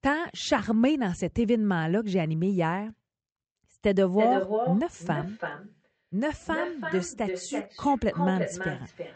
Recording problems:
echo of what is said; strong; from 3.5 s on; 330 ms later, 6 dB below the speech
high frequencies cut off; noticeable; nothing above 8 kHz

